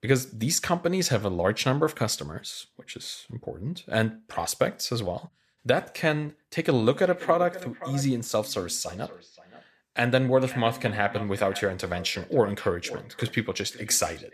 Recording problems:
echo of what is said; noticeable; from 7 s on; 520 ms later, 15 dB below the speech

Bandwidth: 14.5 kHz